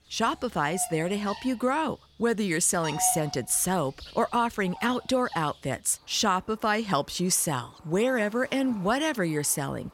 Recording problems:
animal sounds; noticeable; throughout; 15 dB below the speech

